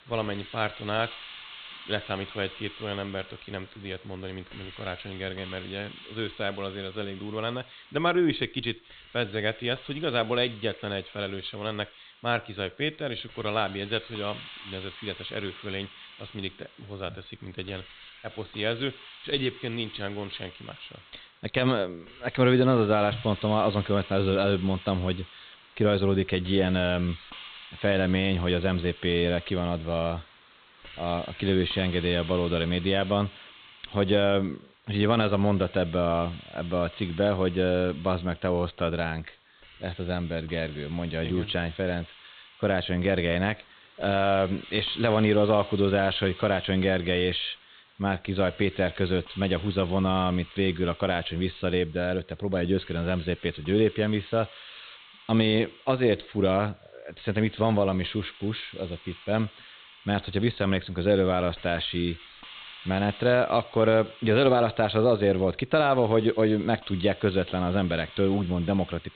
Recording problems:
high frequencies cut off; severe; nothing above 4 kHz
hiss; noticeable; throughout; 20 dB below the speech

